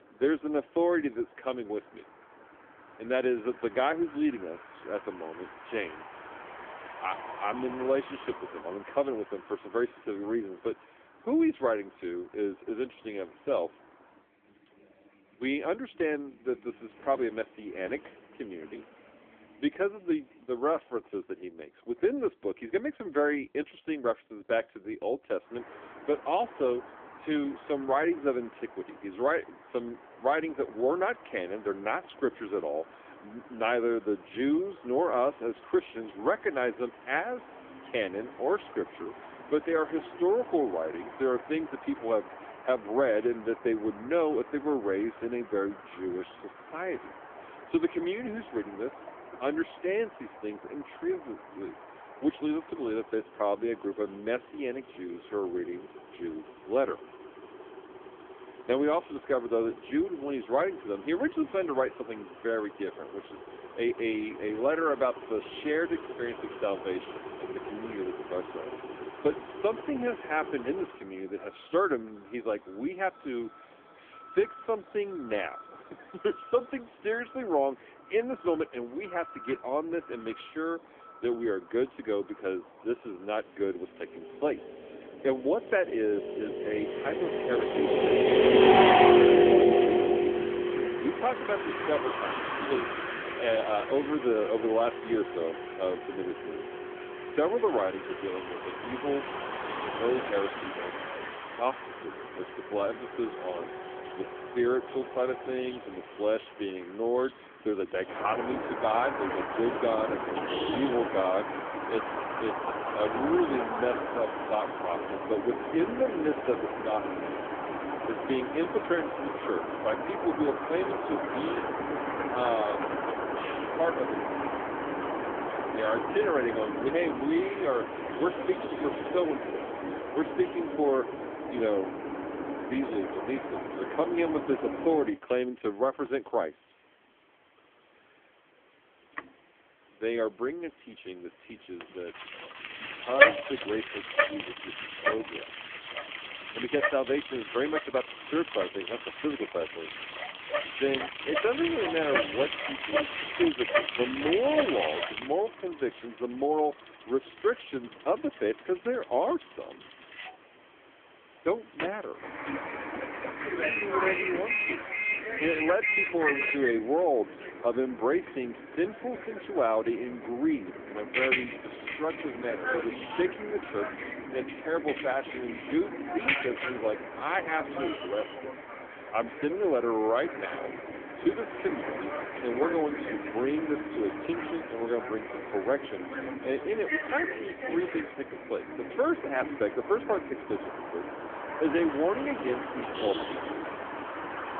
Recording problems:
phone-call audio; poor line; nothing above 3.5 kHz
traffic noise; loud; throughout; as loud as the speech

